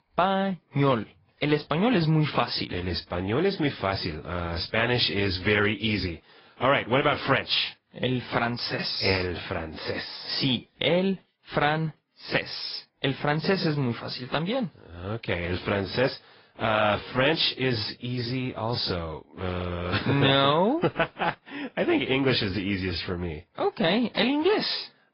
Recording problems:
high frequencies cut off; noticeable; nothing above 5.5 kHz
garbled, watery; slightly

